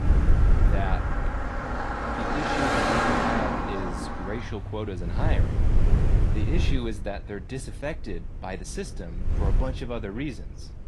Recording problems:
garbled, watery; slightly
traffic noise; very loud; until 6.5 s; 5 dB above the speech
wind noise on the microphone; heavy; 5 dB below the speech

